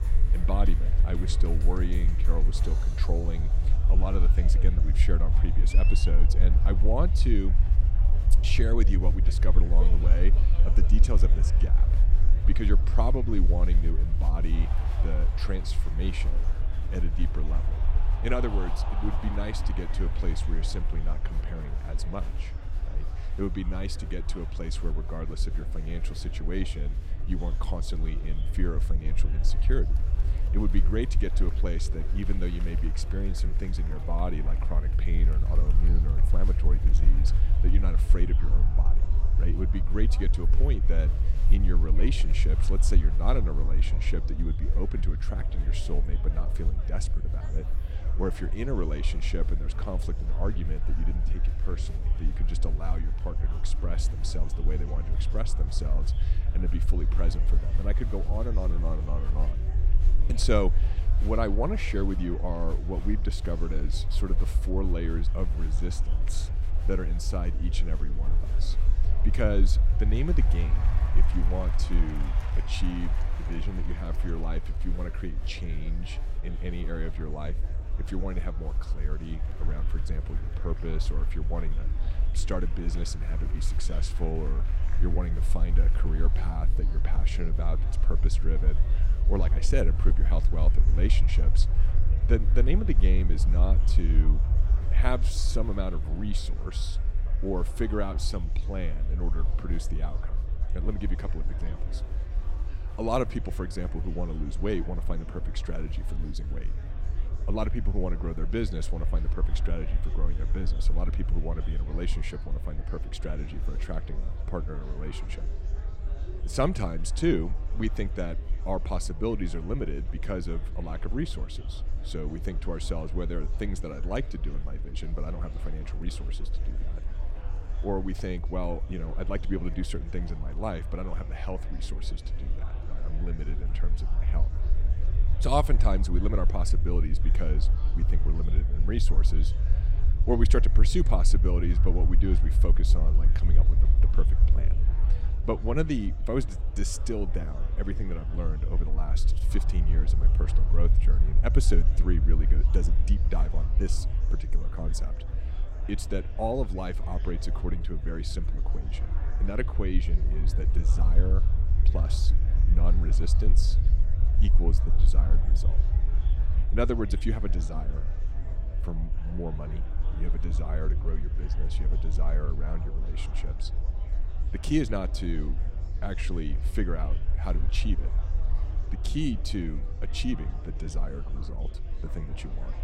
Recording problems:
murmuring crowd; noticeable; throughout; 15 dB below the speech
low rumble; noticeable; throughout; 10 dB below the speech

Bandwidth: 16.5 kHz